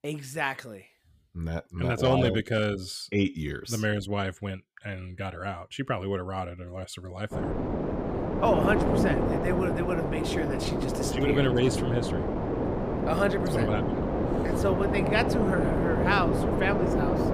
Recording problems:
wind noise on the microphone; heavy; from 7.5 s on; as loud as the speech

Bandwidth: 15 kHz